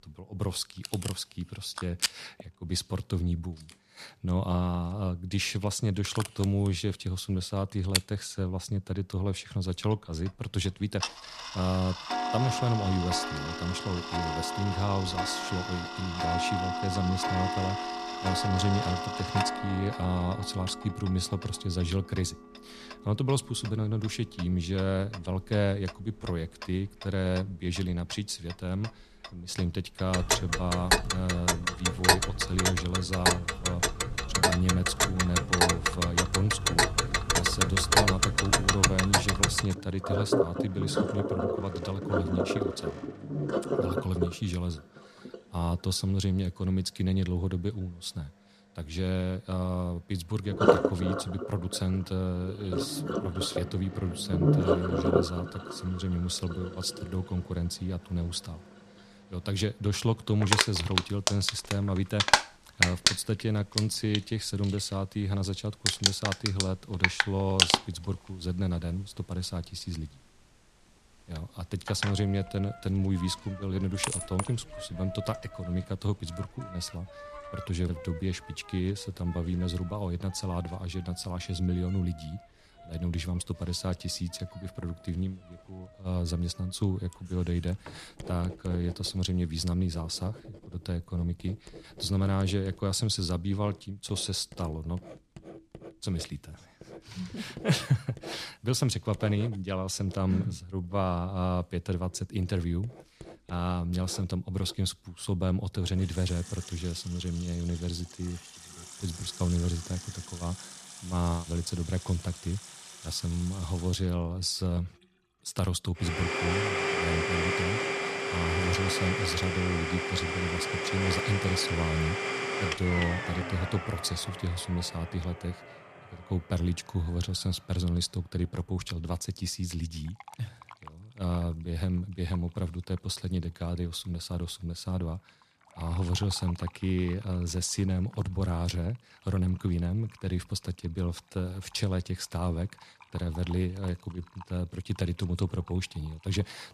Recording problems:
household noises; very loud; throughout; 2 dB above the speech

